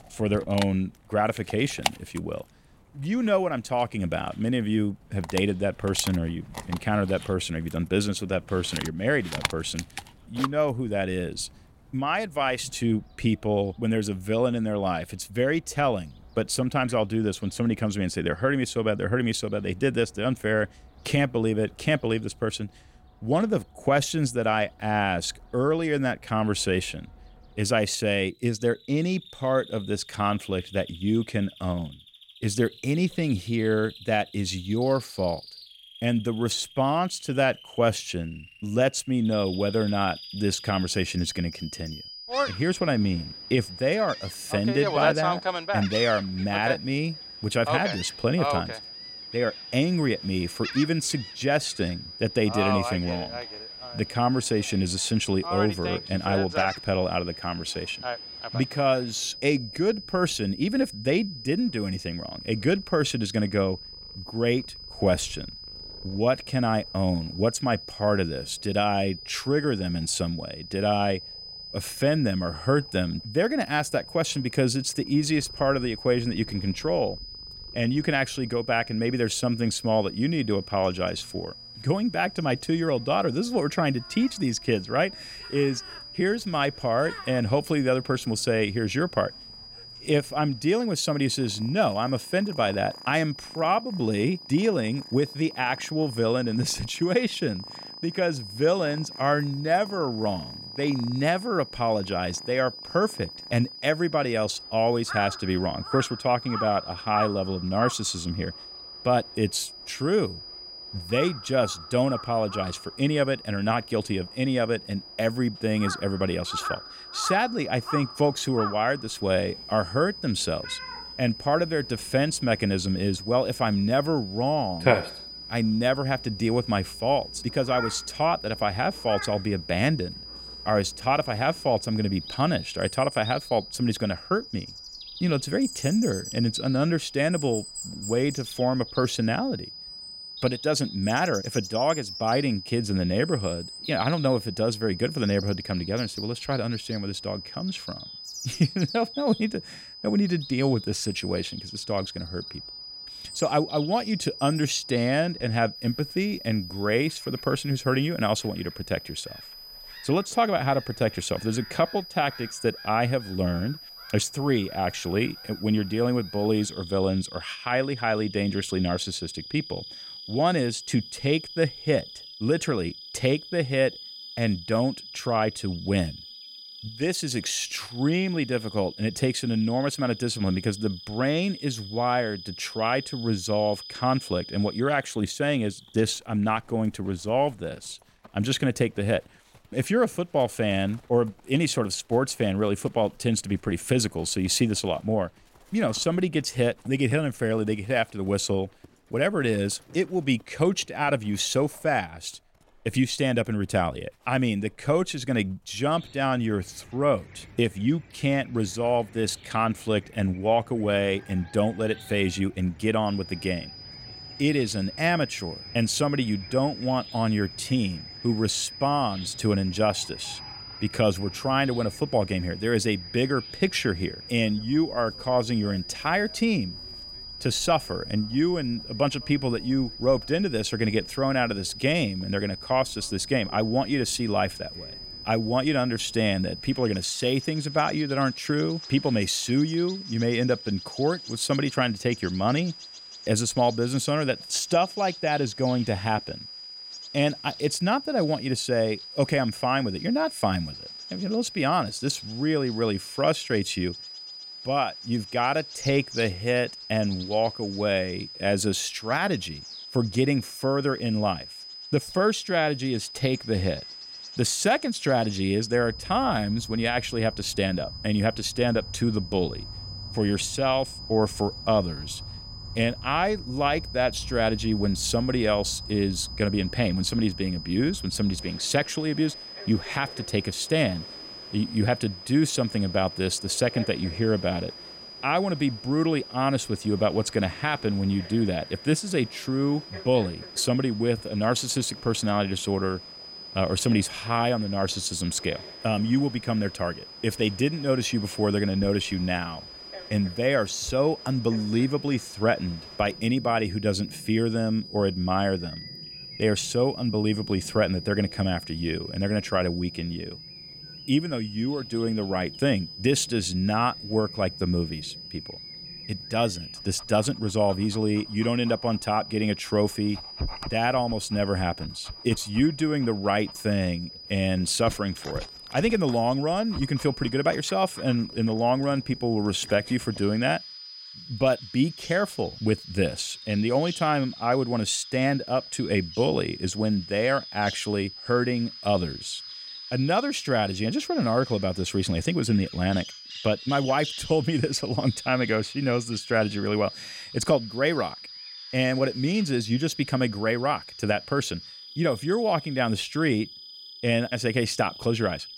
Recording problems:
high-pitched whine; noticeable; from 39 s to 3:05 and from 3:33 on; 5 kHz, 15 dB below the speech
animal sounds; noticeable; throughout; 15 dB below the speech

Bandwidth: 16 kHz